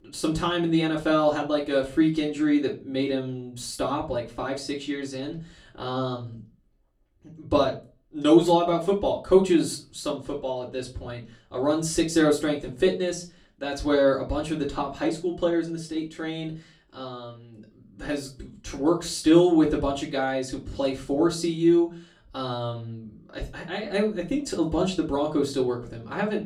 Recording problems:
off-mic speech; far
room echo; very slight; dies away in 0.2 s

